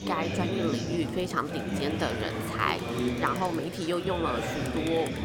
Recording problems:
murmuring crowd; loud; throughout; 1 dB below the speech

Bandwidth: 17 kHz